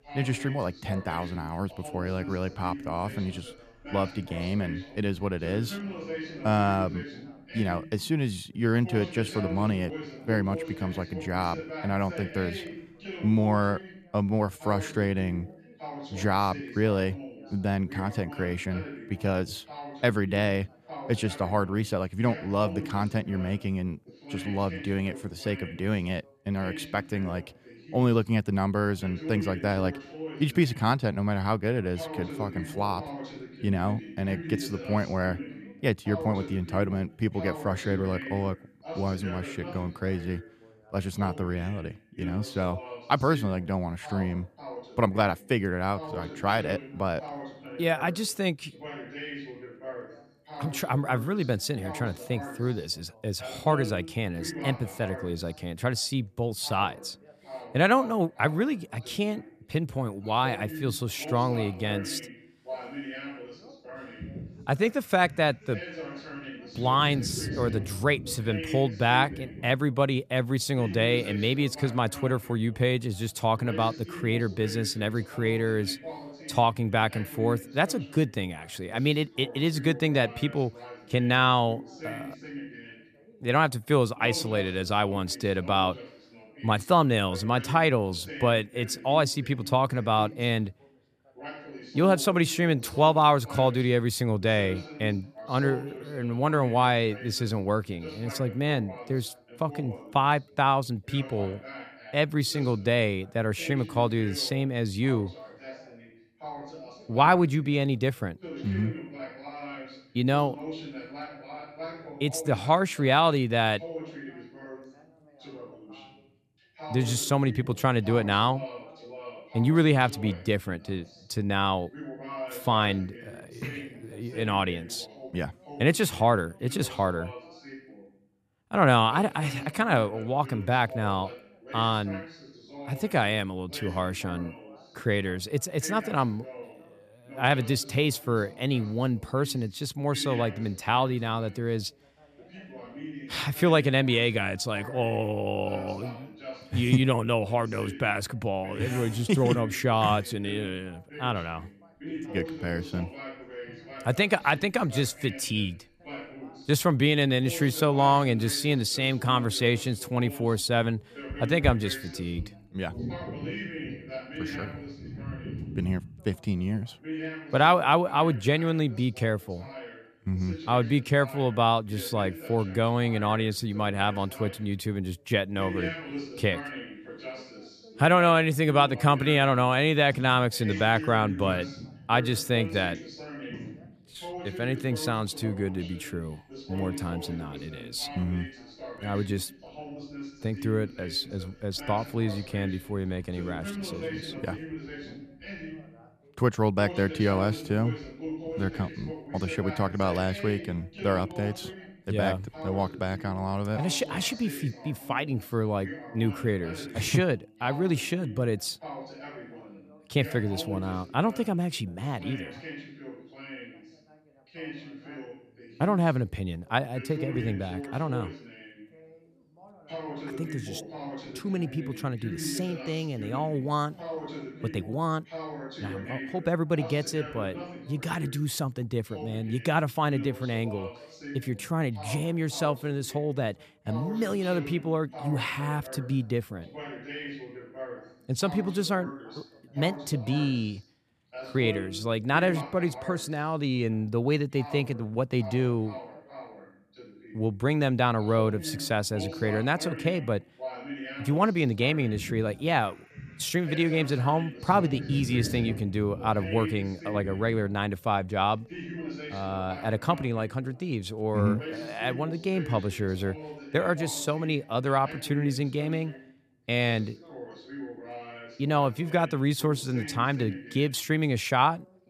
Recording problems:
background chatter; noticeable; throughout; 2 voices, 15 dB below the speech

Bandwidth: 14.5 kHz